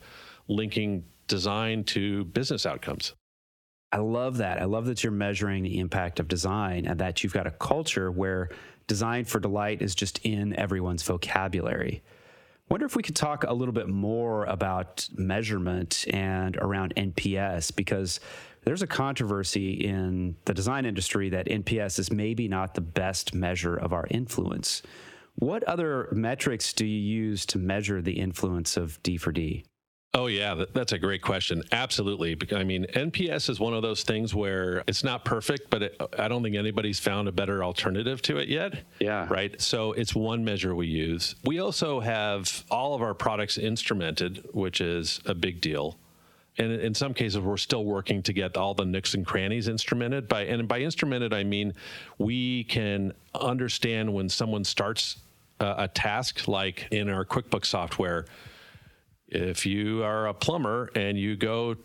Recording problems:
squashed, flat; heavily

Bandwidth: 18 kHz